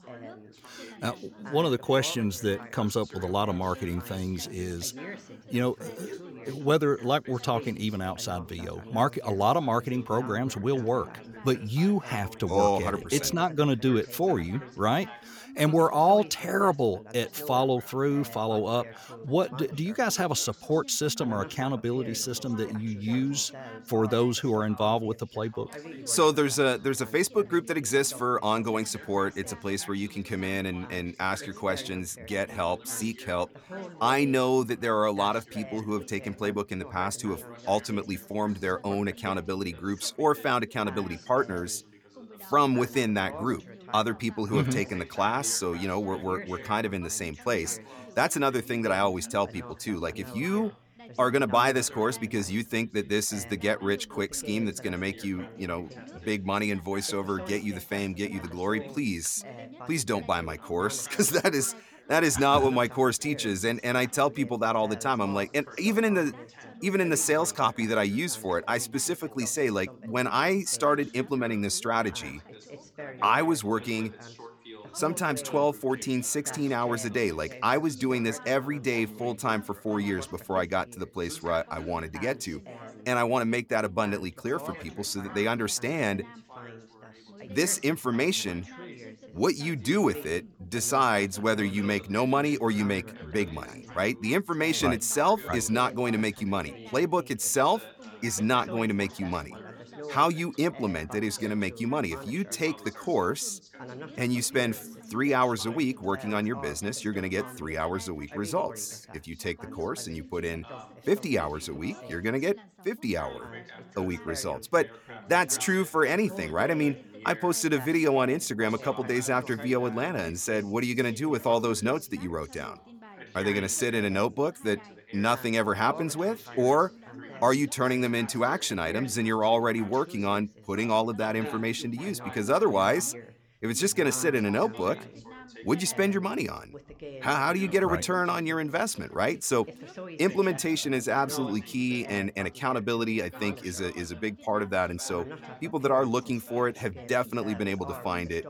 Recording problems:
background chatter; noticeable; throughout; 3 voices, 15 dB below the speech

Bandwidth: 18.5 kHz